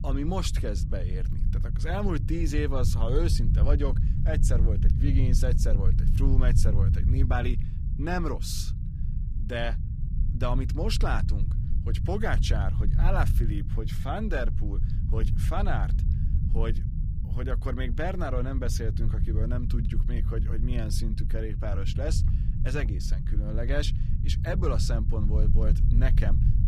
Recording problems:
low rumble; loud; throughout; 8 dB below the speech

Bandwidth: 14.5 kHz